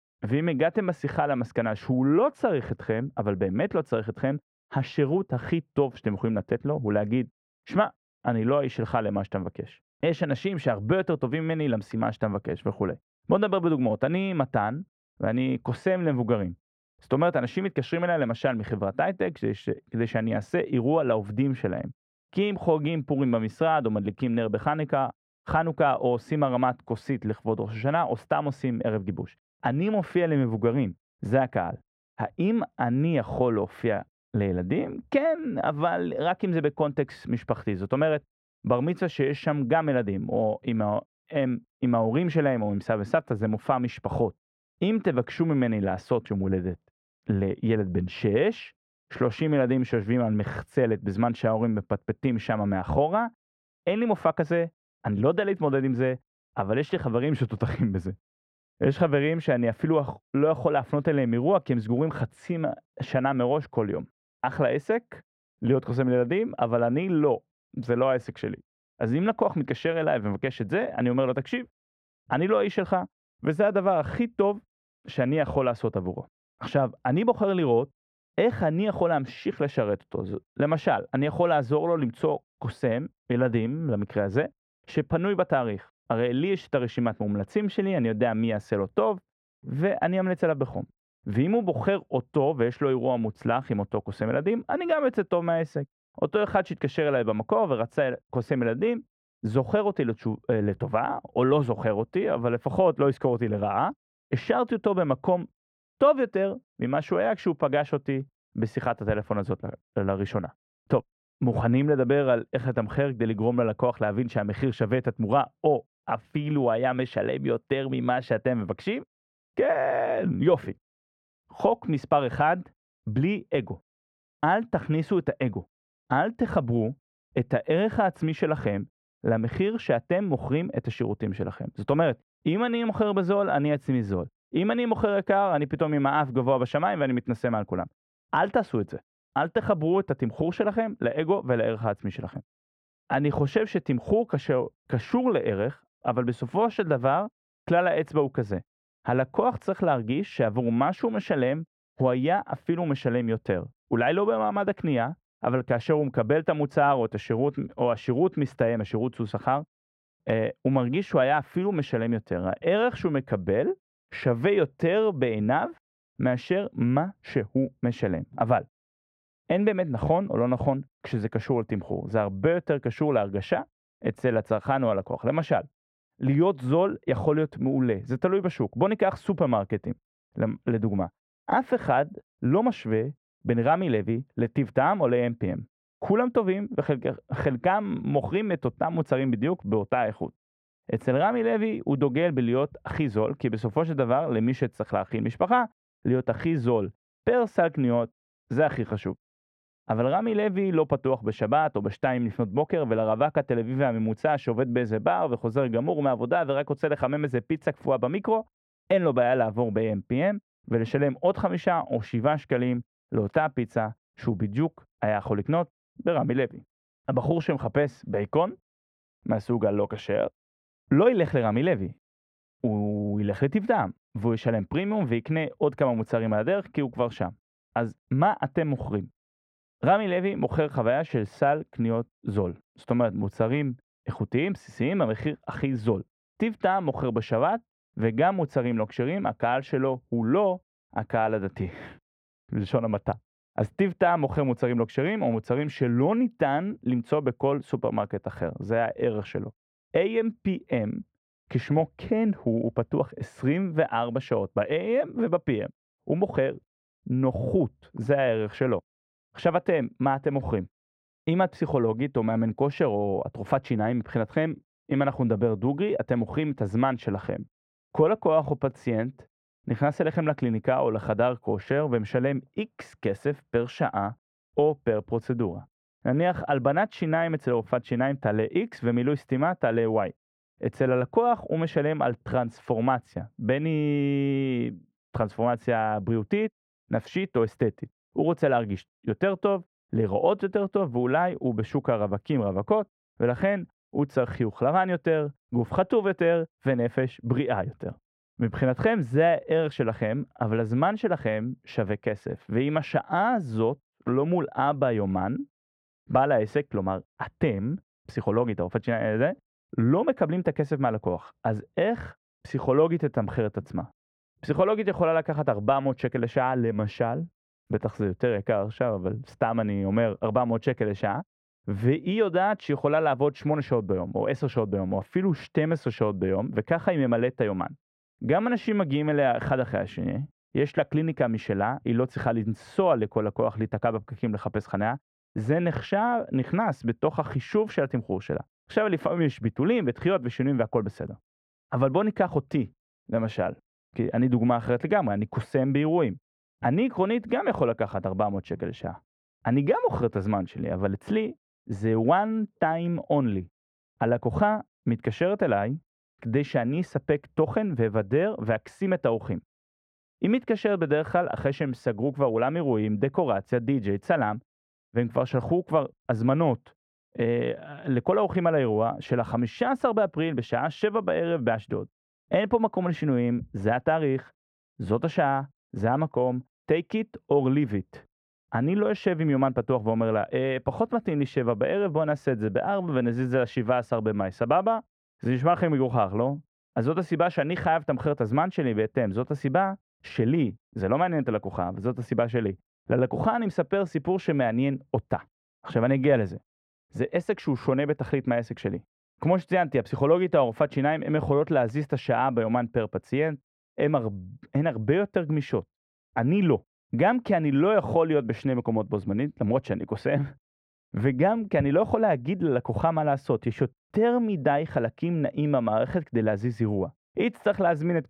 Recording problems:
muffled; very; fading above 3 kHz

